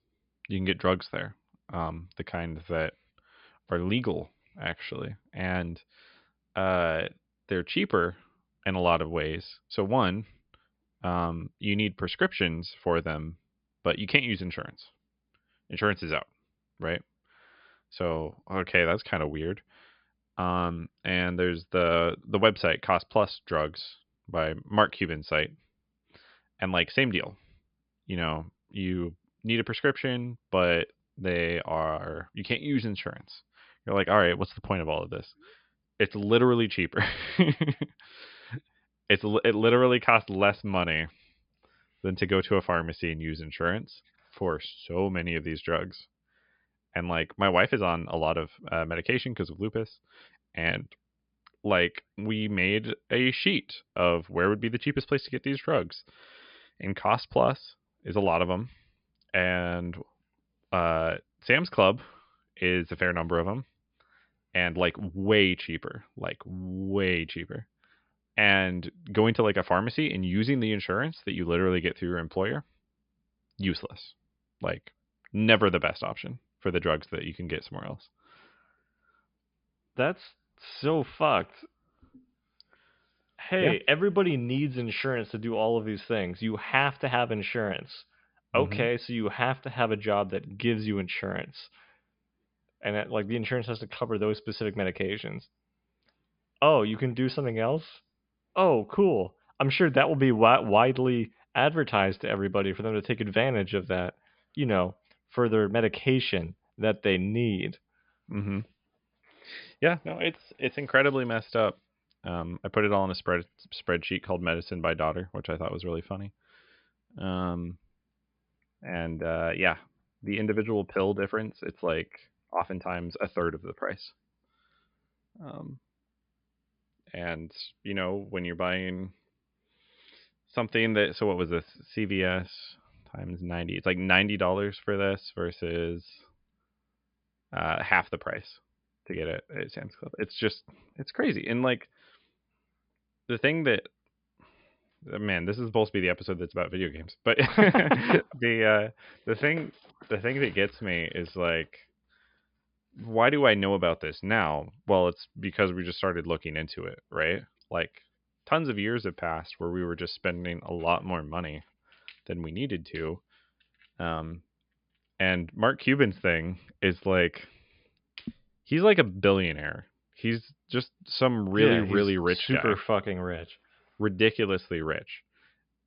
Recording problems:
high frequencies cut off; noticeable; nothing above 5 kHz

